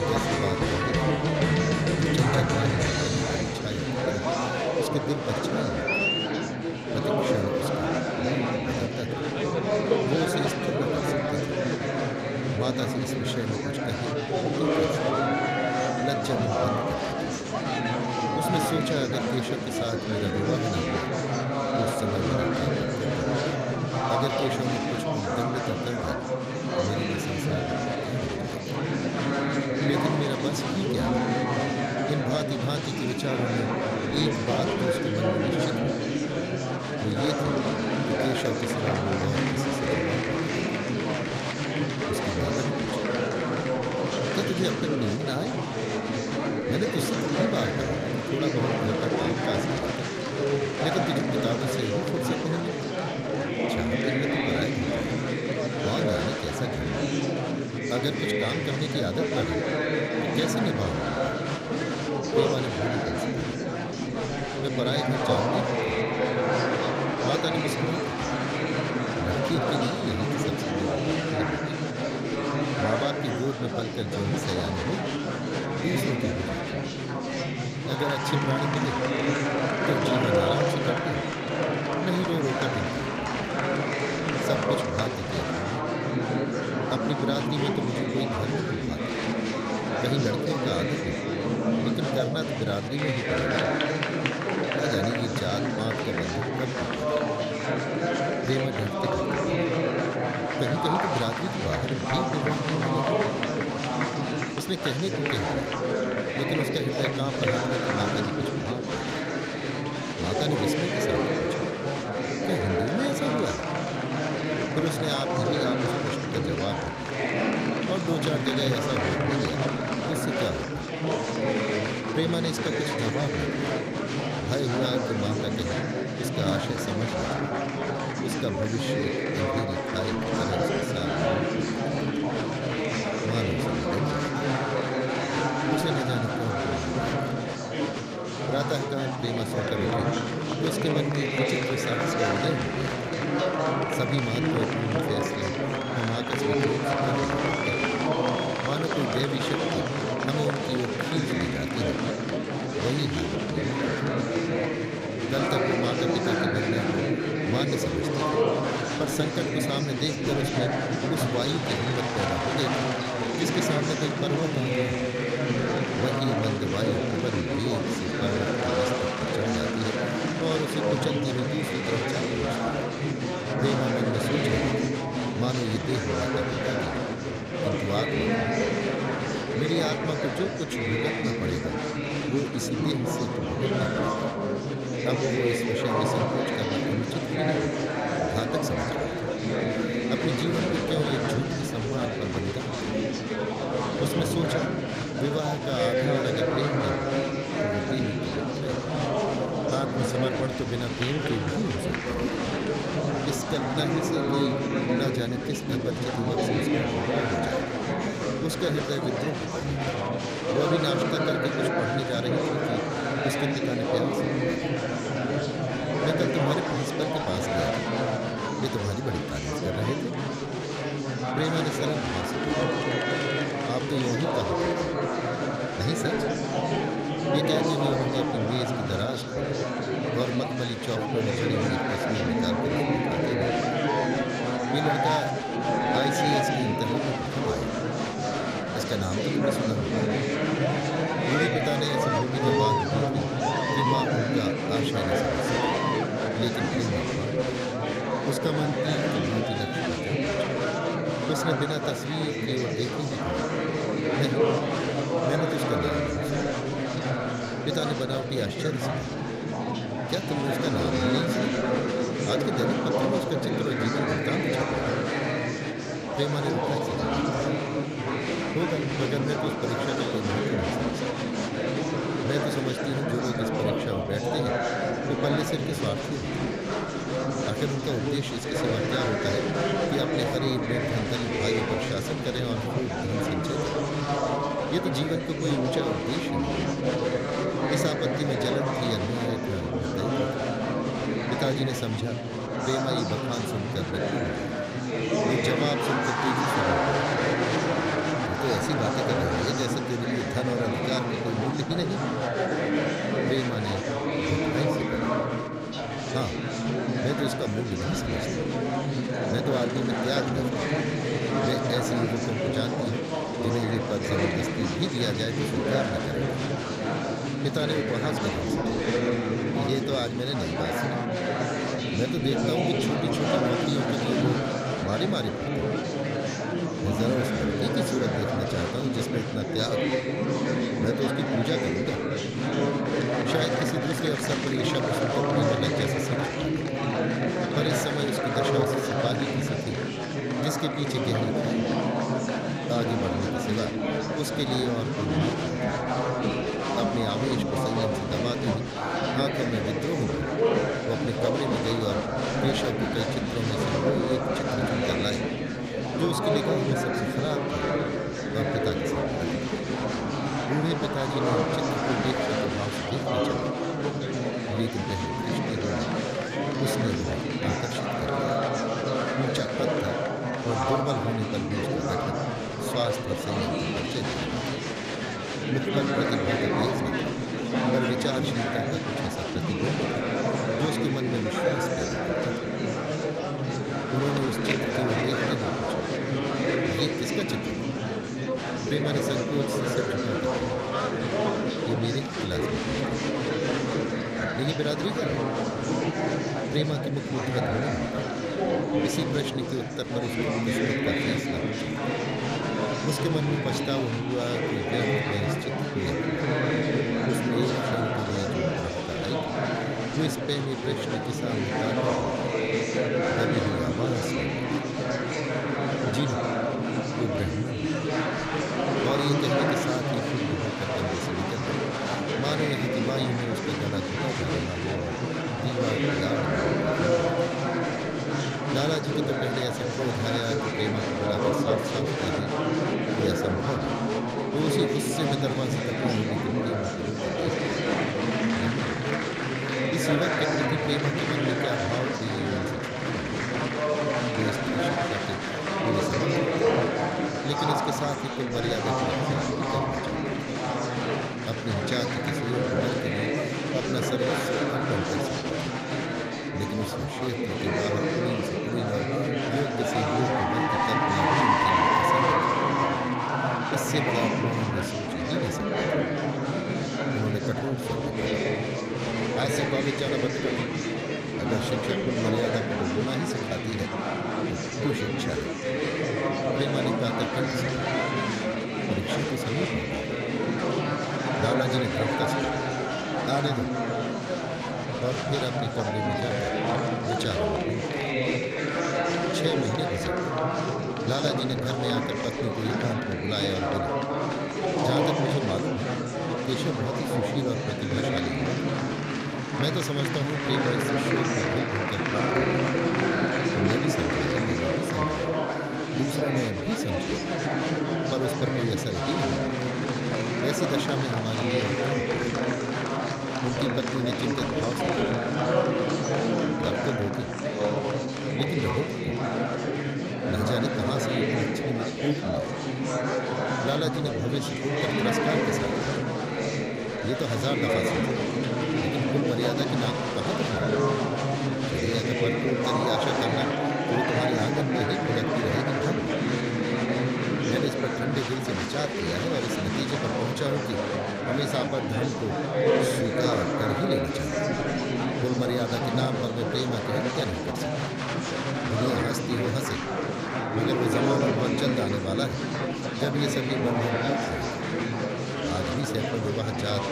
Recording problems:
murmuring crowd; very loud; throughout; 5 dB above the speech

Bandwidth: 15.5 kHz